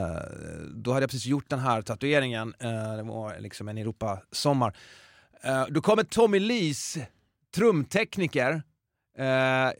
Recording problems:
abrupt cut into speech; at the start

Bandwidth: 16 kHz